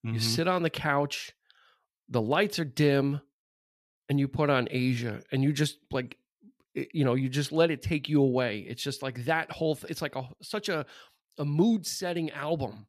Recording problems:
none

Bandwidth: 14.5 kHz